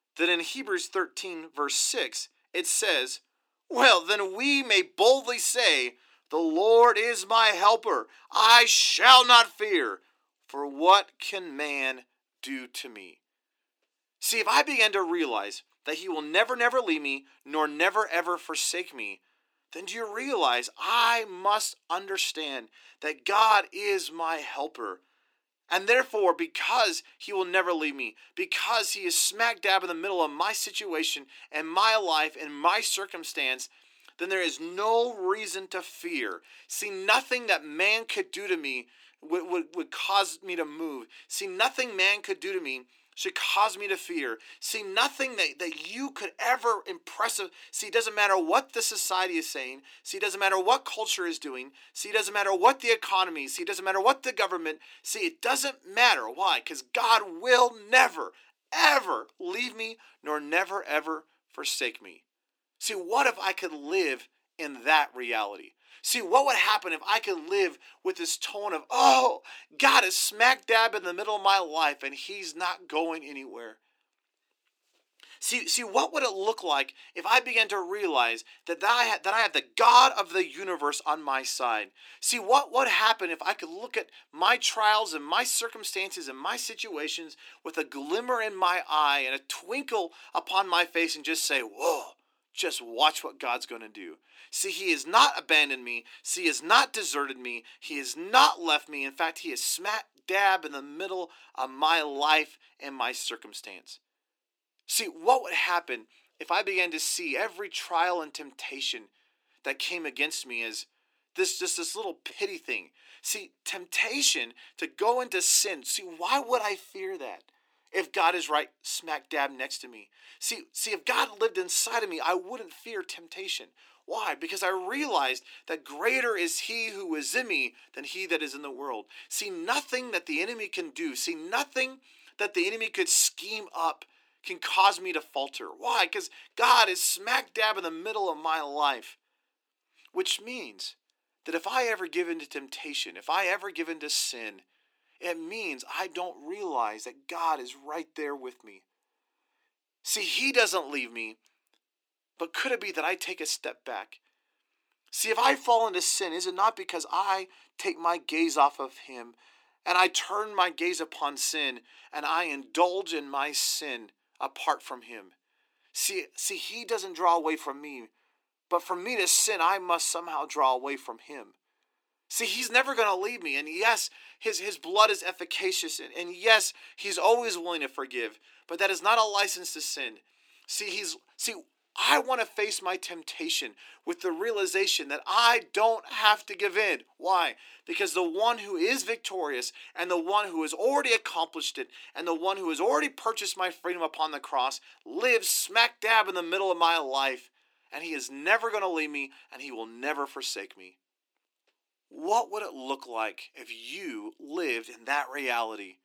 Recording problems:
thin; somewhat; fading below 300 Hz

